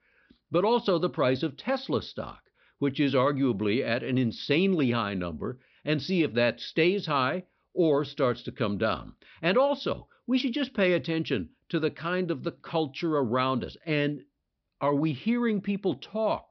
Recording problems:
high frequencies cut off; noticeable; nothing above 5.5 kHz

